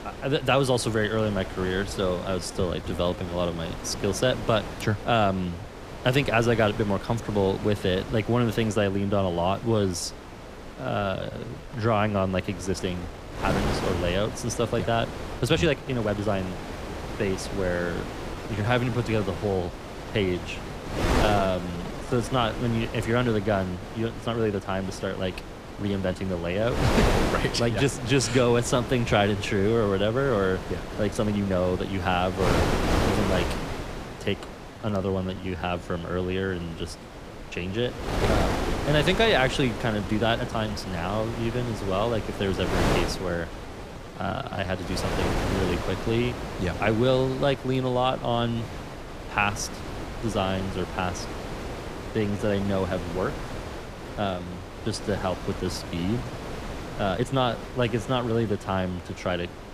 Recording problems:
wind noise on the microphone; heavy; 7 dB below the speech
uneven, jittery; strongly; from 2.5 to 57 s

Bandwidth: 15 kHz